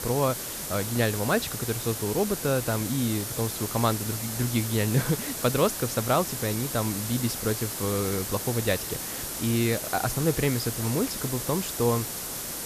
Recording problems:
hiss; loud; throughout; 4 dB below the speech

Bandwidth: 14.5 kHz